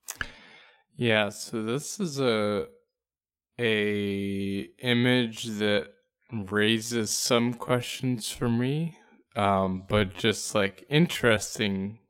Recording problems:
wrong speed, natural pitch; too slow; 0.5 times normal speed

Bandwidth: 16 kHz